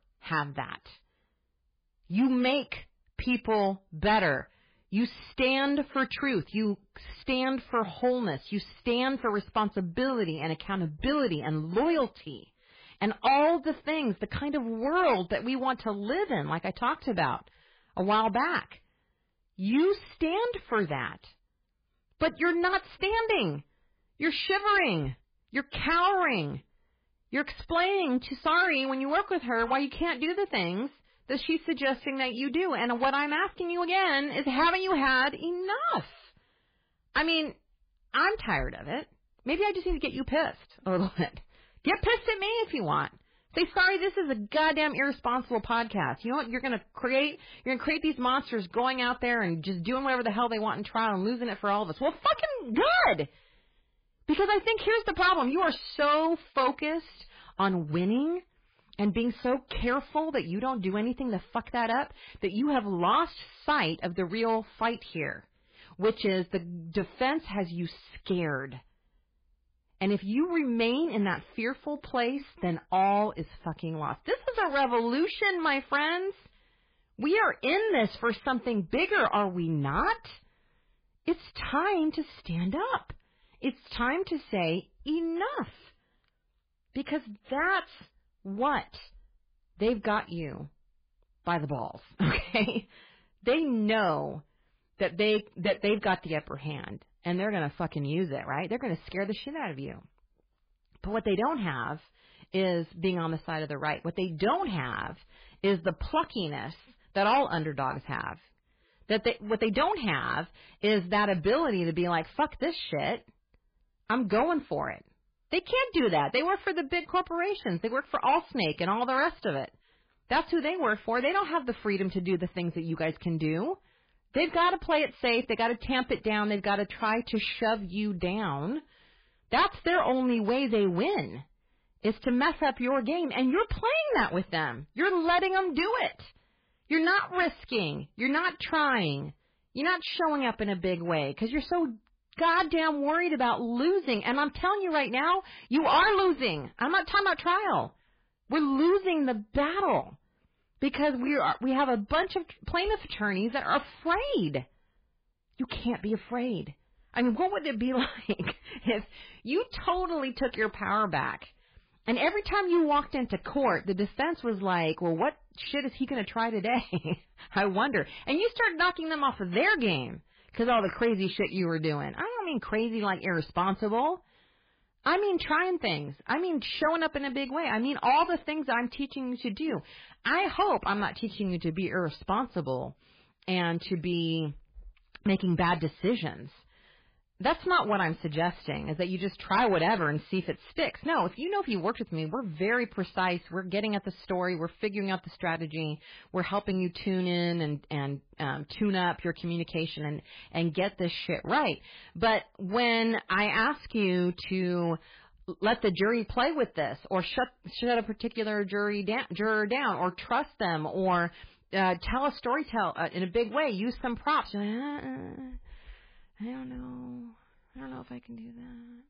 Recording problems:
garbled, watery; badly; nothing above 4.5 kHz
distortion; slight; 4% of the sound clipped

